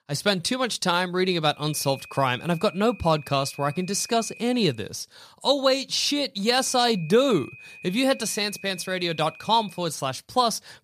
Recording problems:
high-pitched whine; noticeable; from 1.5 to 4.5 s and from 6.5 to 10 s; 2.5 kHz, 20 dB below the speech

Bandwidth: 15 kHz